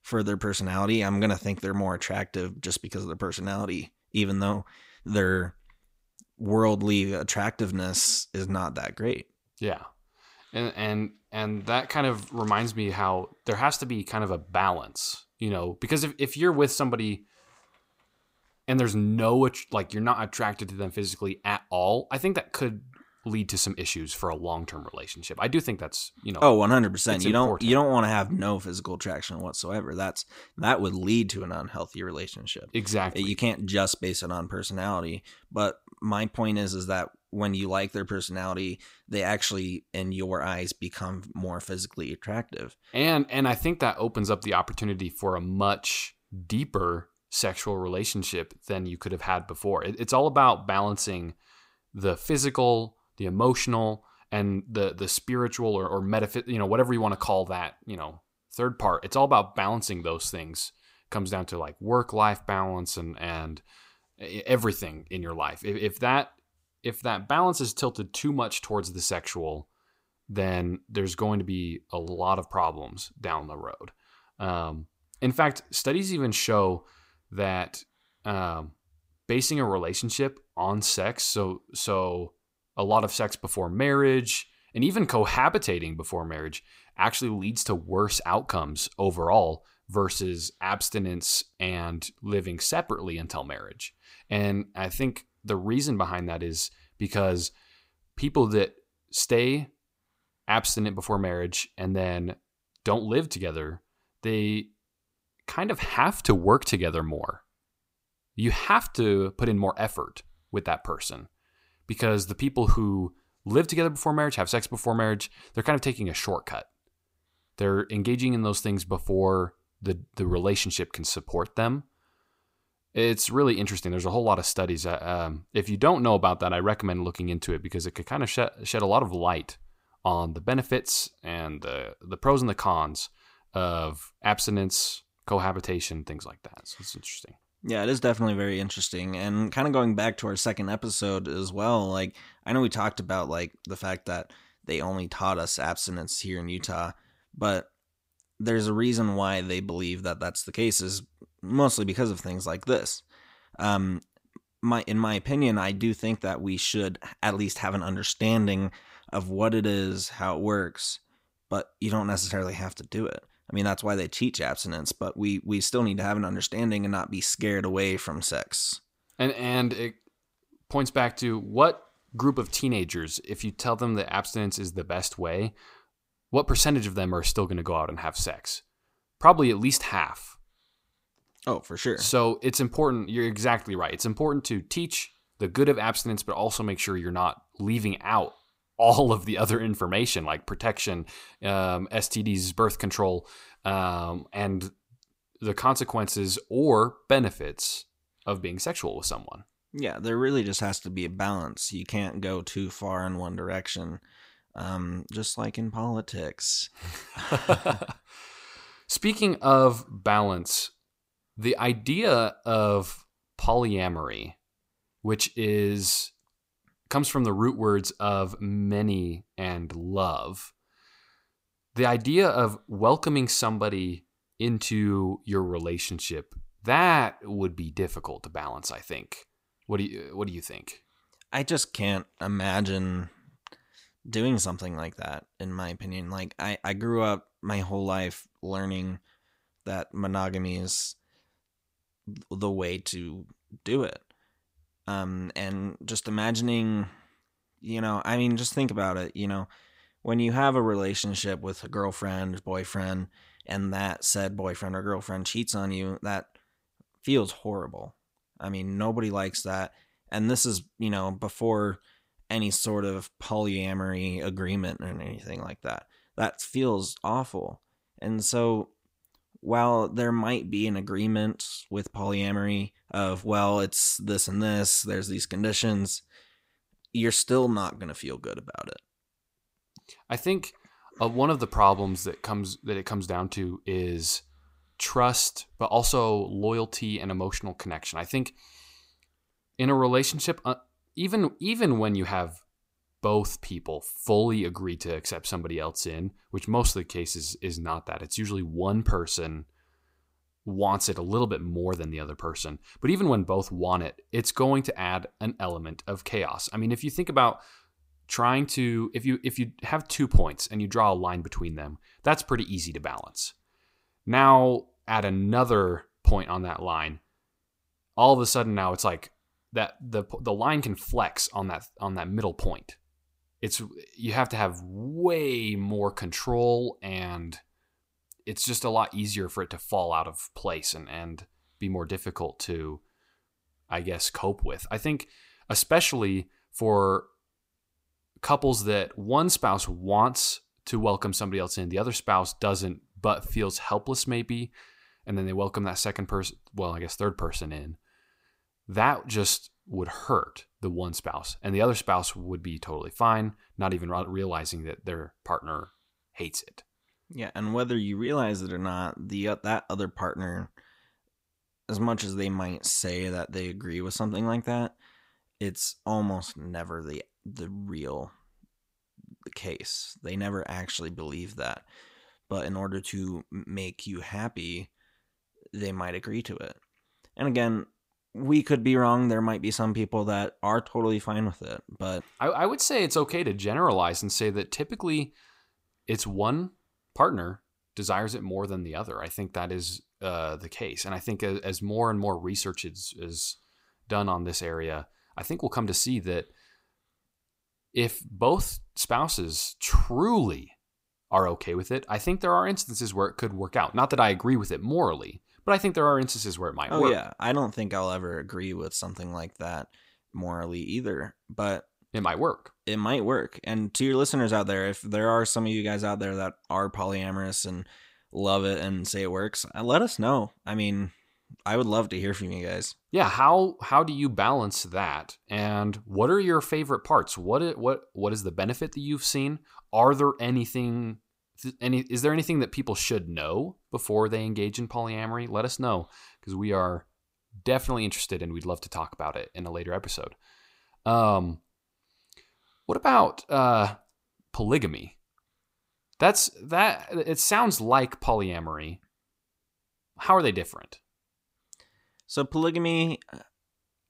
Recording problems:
none

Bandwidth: 15.5 kHz